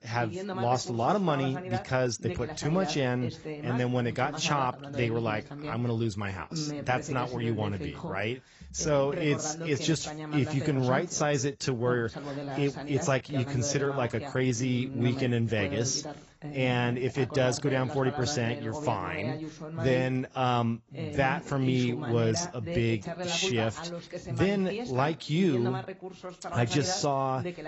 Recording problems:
garbled, watery; badly; nothing above 7.5 kHz
voice in the background; loud; throughout; 9 dB below the speech

